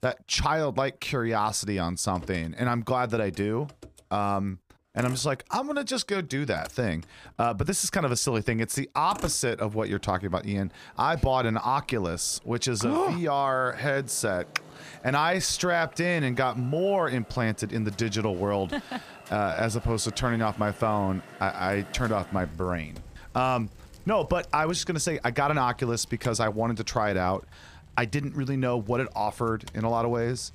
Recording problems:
traffic noise; faint; throughout; 20 dB below the speech

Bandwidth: 15 kHz